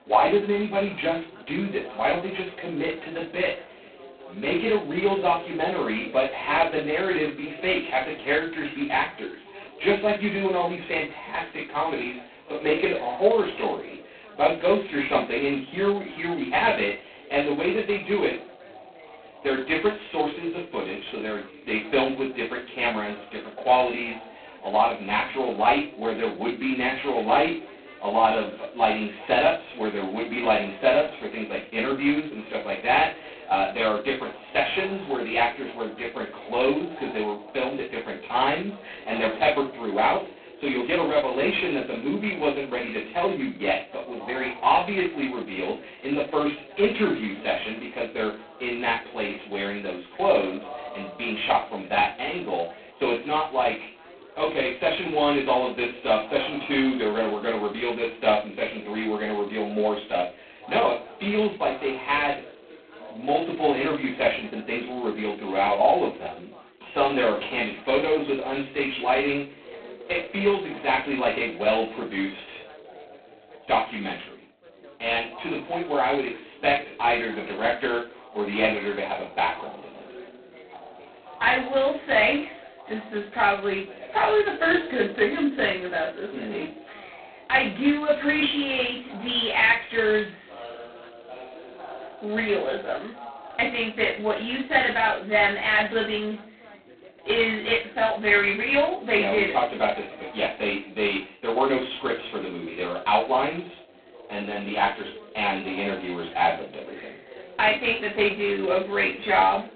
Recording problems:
phone-call audio; poor line; nothing above 4 kHz
off-mic speech; far
room echo; slight; dies away in 0.3 s
background chatter; noticeable; throughout; 4 voices, 20 dB below the speech

